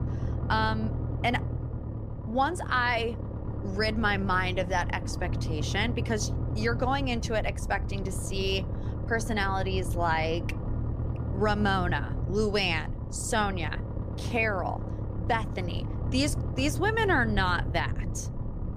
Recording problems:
low rumble; noticeable; throughout; 15 dB below the speech

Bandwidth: 15 kHz